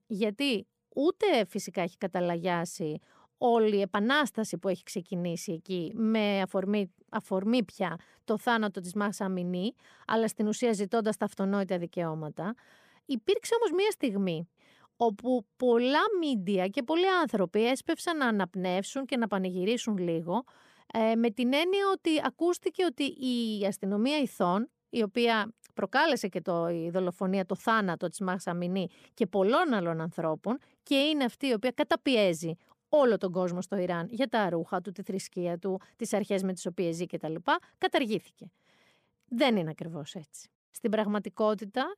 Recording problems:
none

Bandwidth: 15 kHz